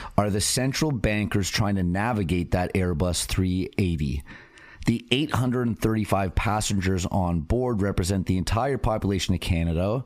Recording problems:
squashed, flat; somewhat

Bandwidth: 15 kHz